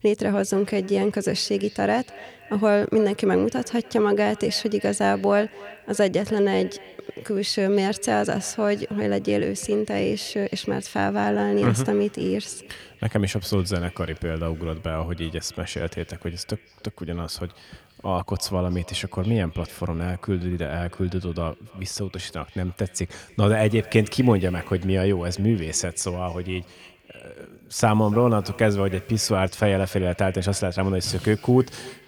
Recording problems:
echo of what is said; faint; throughout; 290 ms later, 20 dB below the speech

